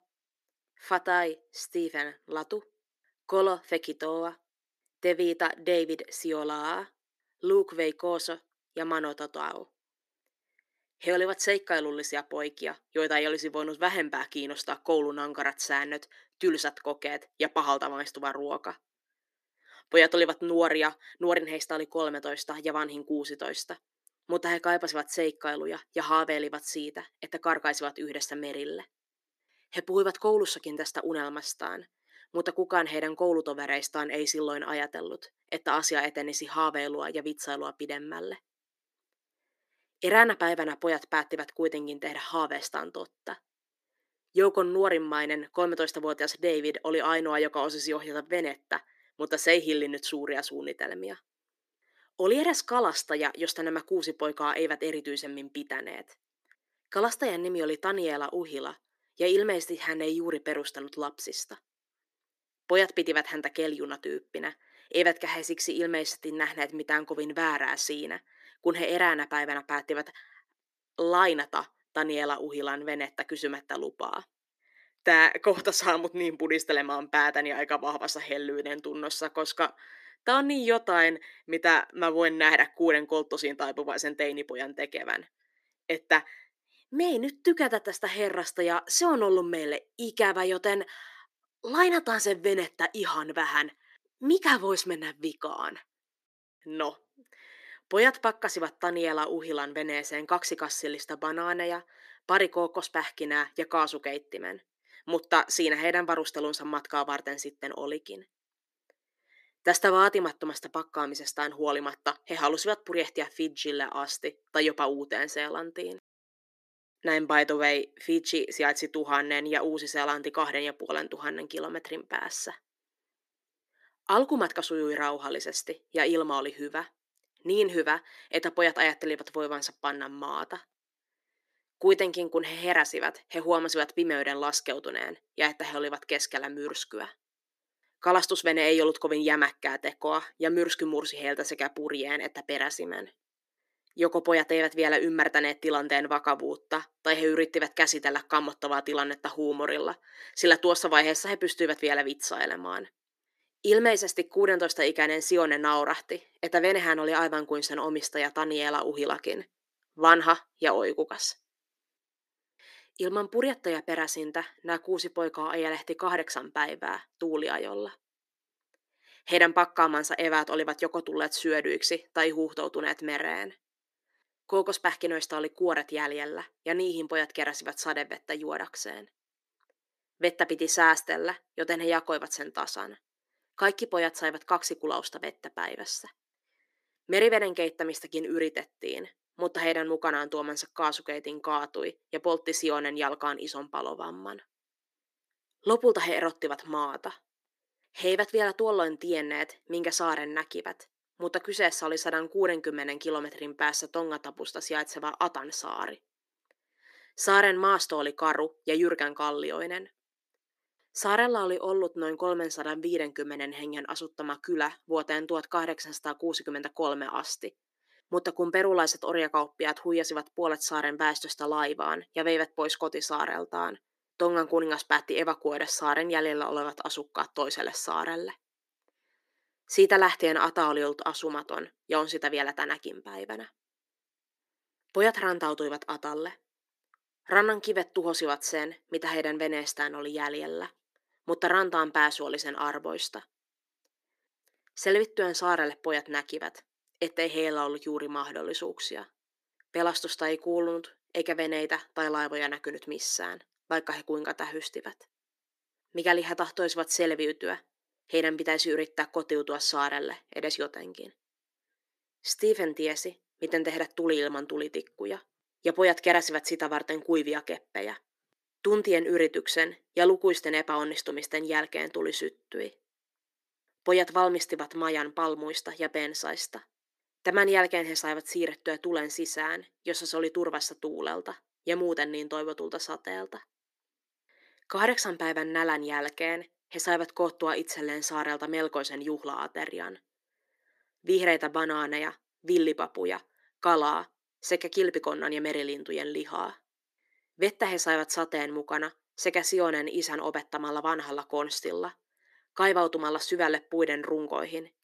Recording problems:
thin; somewhat; fading below 350 Hz

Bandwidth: 14.5 kHz